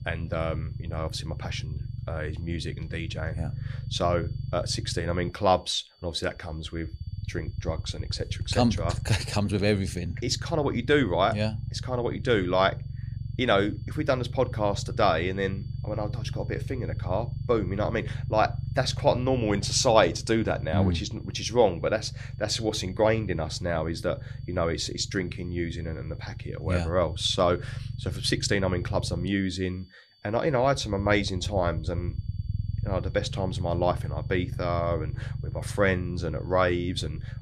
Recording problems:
high-pitched whine; faint; throughout; 4.5 kHz, 35 dB below the speech
low rumble; faint; throughout; 20 dB below the speech

